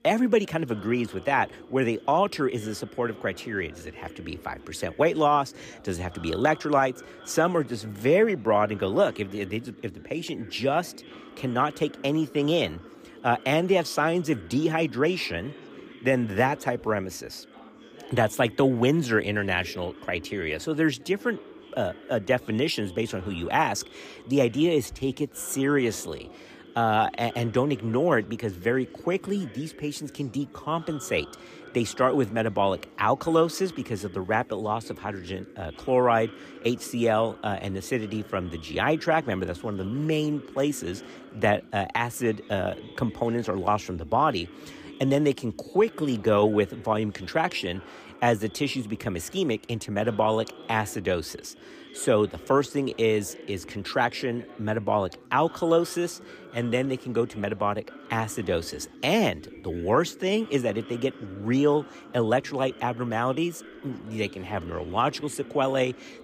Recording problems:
background chatter; noticeable; throughout; 4 voices, 20 dB below the speech

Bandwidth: 15 kHz